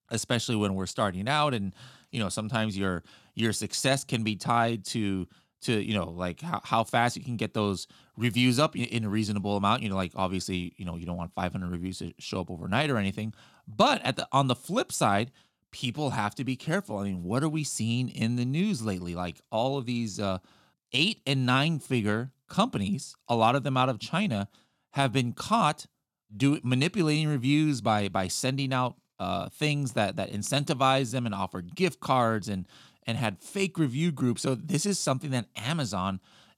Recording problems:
none

